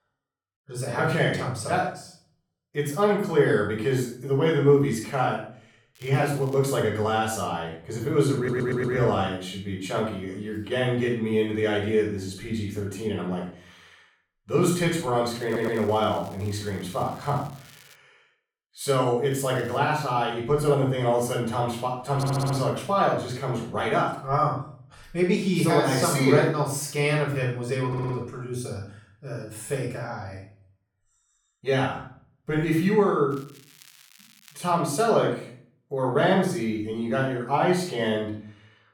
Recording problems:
off-mic speech; far
room echo; noticeable; dies away in 0.4 s
crackling; faint; 4 times, first at 6 s; 25 dB below the speech
audio stuttering; 4 times, first at 8.5 s

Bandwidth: 18.5 kHz